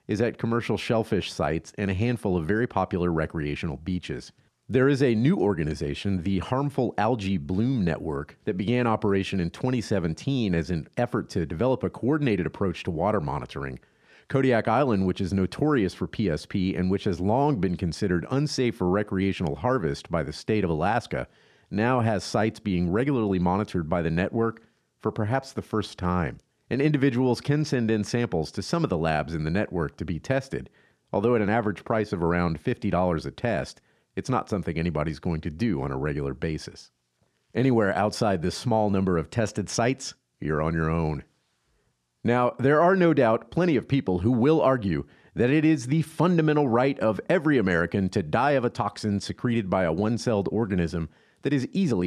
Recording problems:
abrupt cut into speech; at the end

